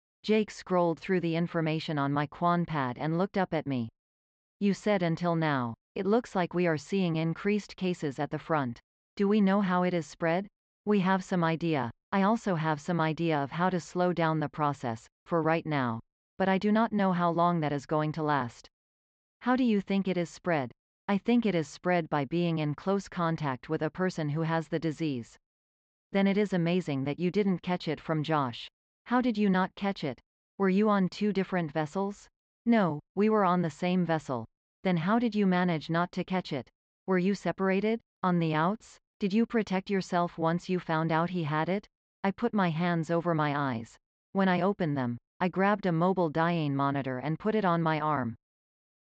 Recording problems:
high frequencies cut off; noticeable; nothing above 8 kHz
muffled; very slightly; fading above 3.5 kHz

